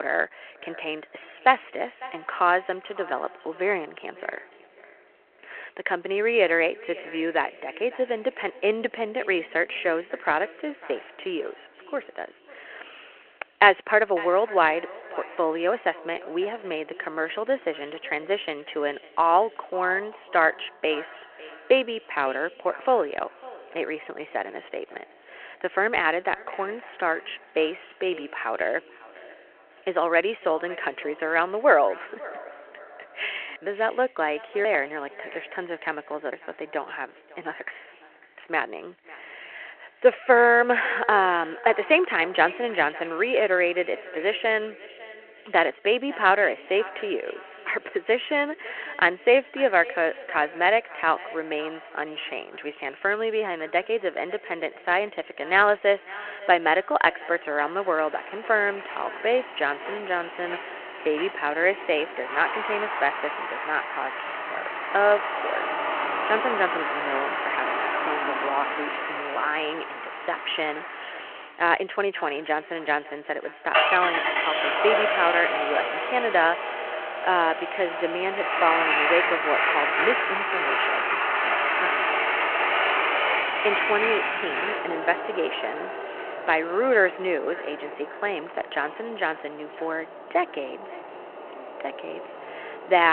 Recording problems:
echo of what is said; faint; throughout; 550 ms later, 20 dB below the speech
phone-call audio
traffic noise; loud; from 58 s on; as loud as the speech
abrupt cut into speech; at the start and the end

